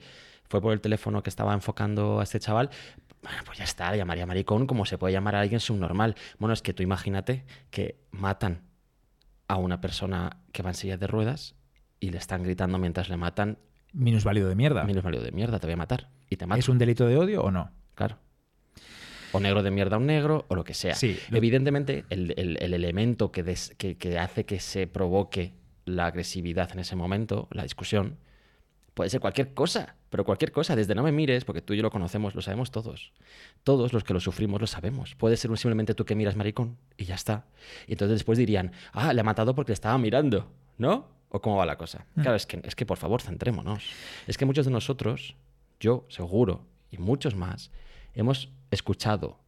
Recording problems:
none

